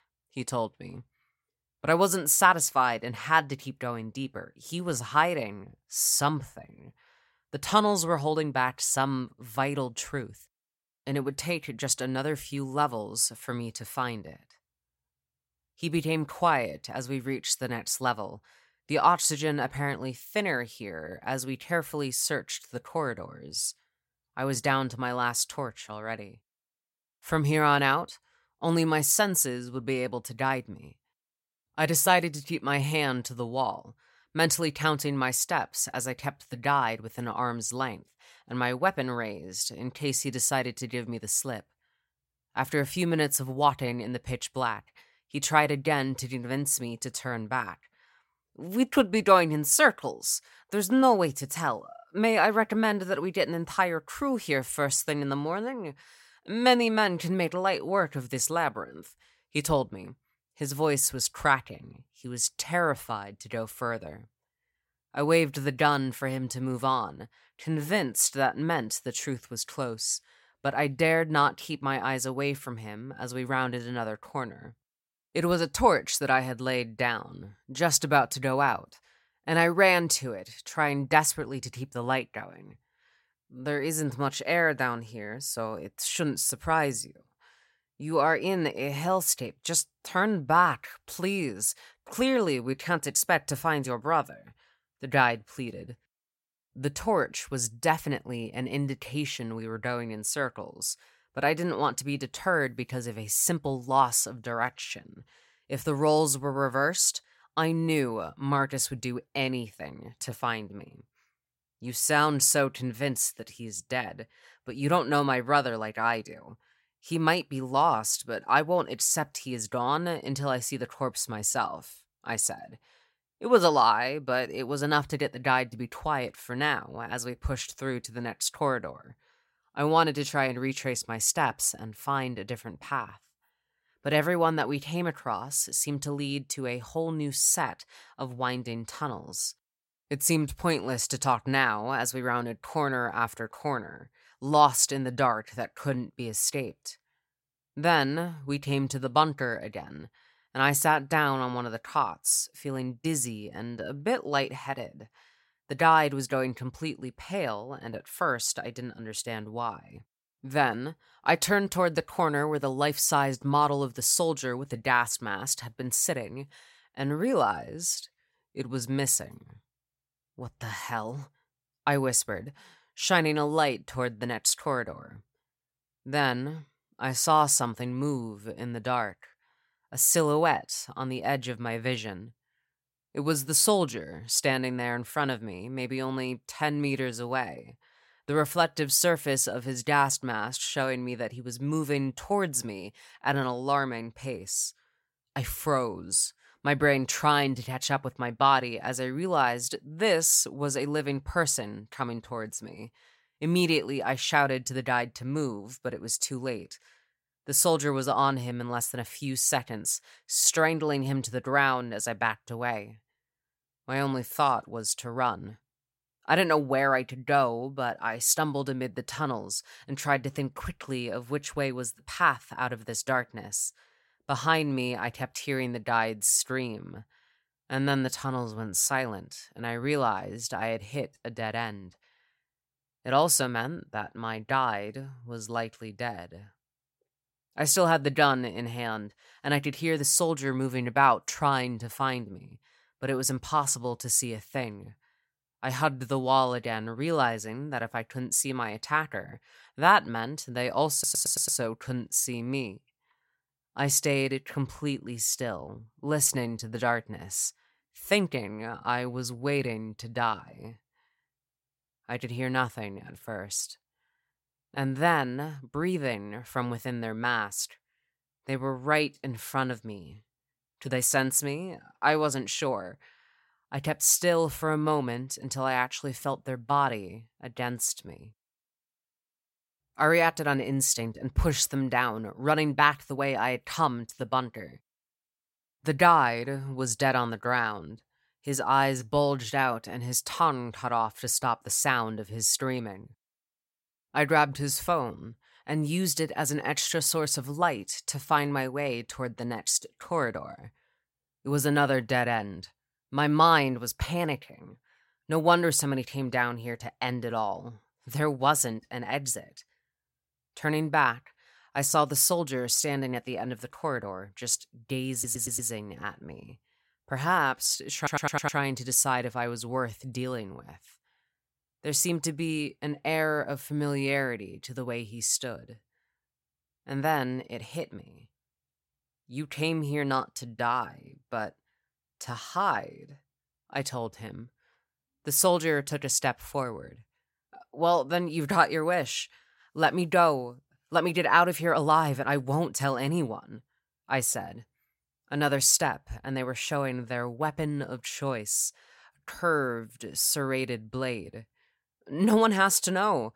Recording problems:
audio stuttering; at 4:11, at 5:15 and at 5:18

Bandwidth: 16 kHz